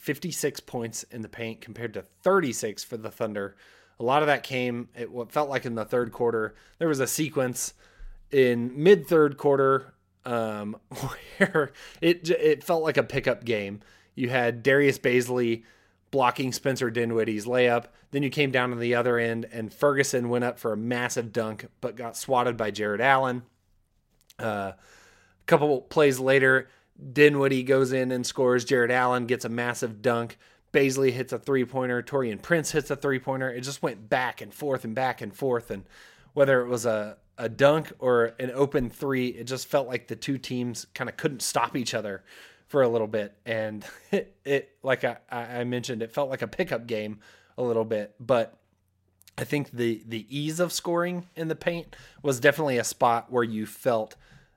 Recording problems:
none

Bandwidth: 16 kHz